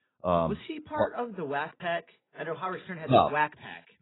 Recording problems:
garbled, watery; badly; nothing above 4 kHz

